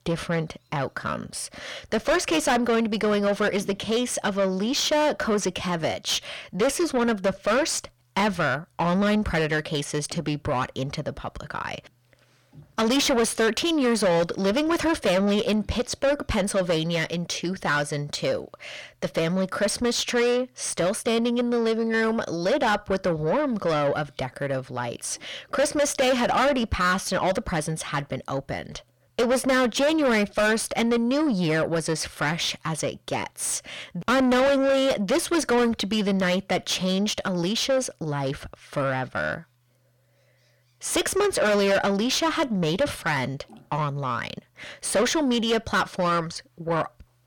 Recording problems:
distortion; heavy; 5 dB below the speech

